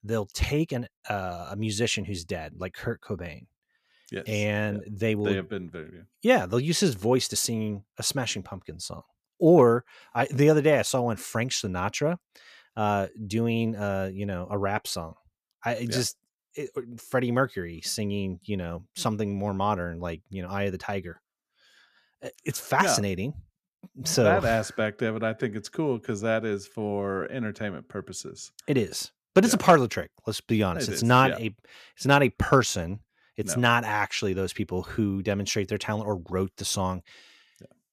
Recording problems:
none

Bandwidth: 14.5 kHz